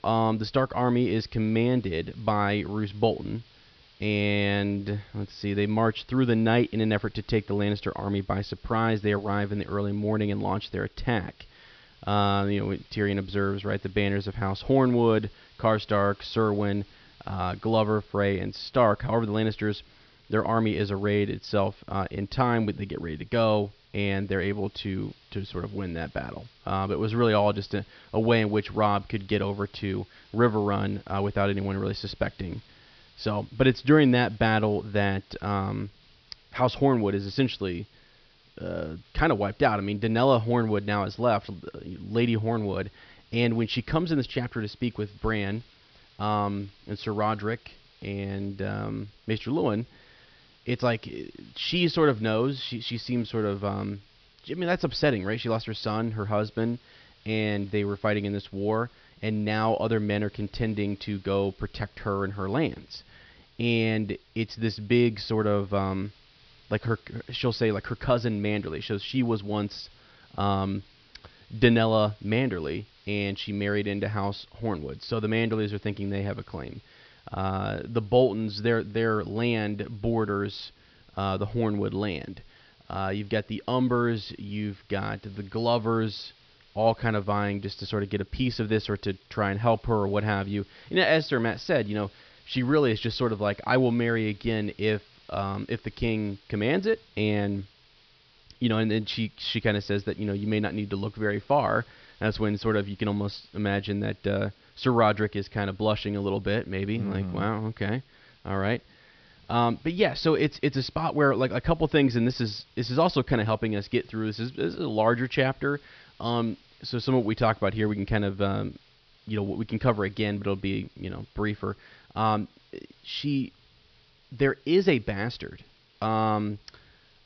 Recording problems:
high frequencies cut off; noticeable; nothing above 5.5 kHz
hiss; faint; throughout; 30 dB below the speech

